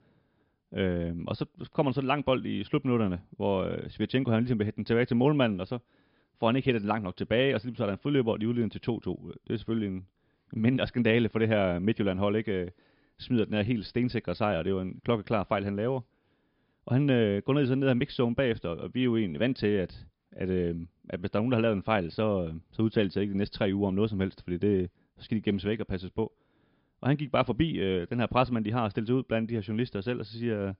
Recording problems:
high frequencies cut off; noticeable; nothing above 5.5 kHz

